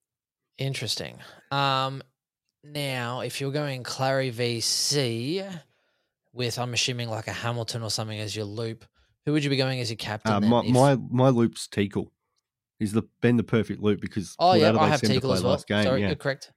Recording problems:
none

